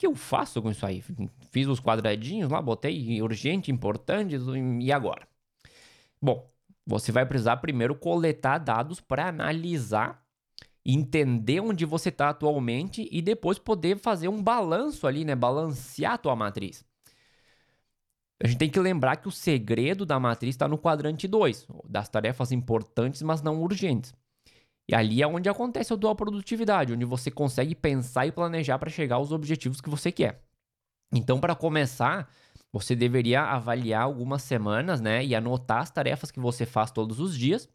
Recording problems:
none

